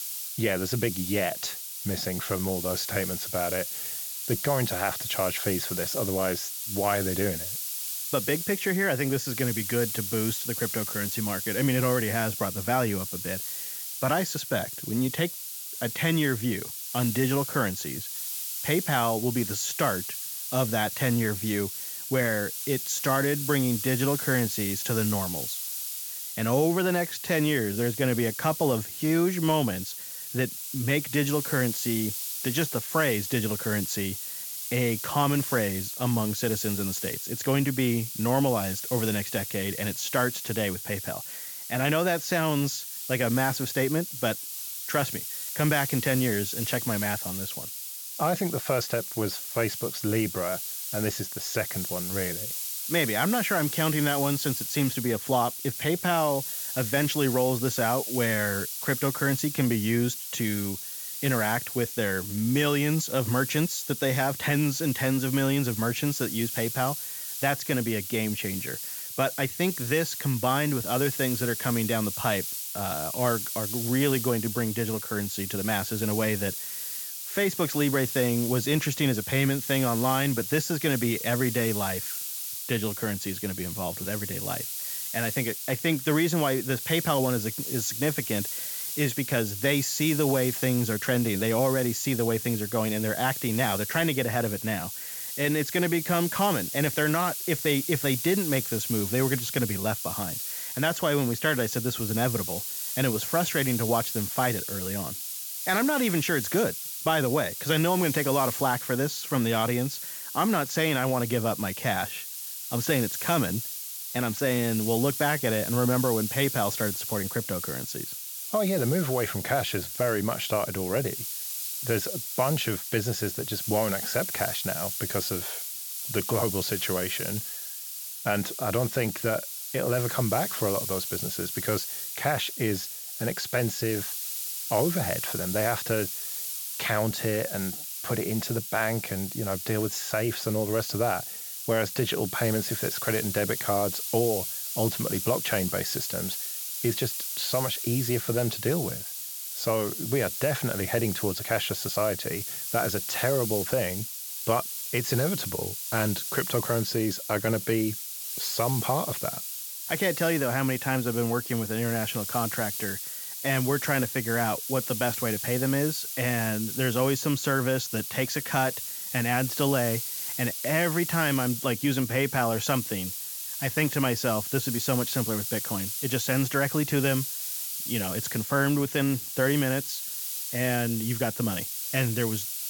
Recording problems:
high frequencies cut off; noticeable; nothing above 8 kHz
hiss; loud; throughout; 4 dB below the speech

